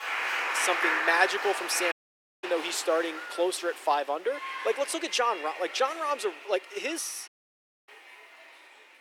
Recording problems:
thin; very; fading below 350 Hz
crowd noise; loud; throughout; 3 dB below the speech
animal sounds; faint; throughout; 25 dB below the speech
audio cutting out; at 2 s for 0.5 s and at 7.5 s for 0.5 s

